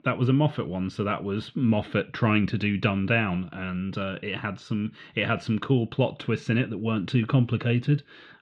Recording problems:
muffled; very; fading above 3.5 kHz

